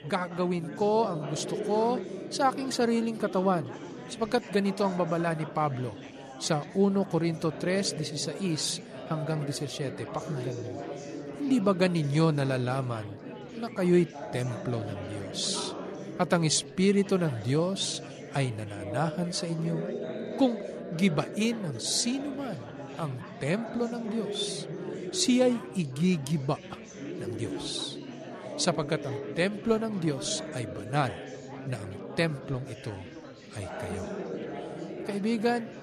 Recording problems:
chatter from many people; loud; throughout; 10 dB below the speech

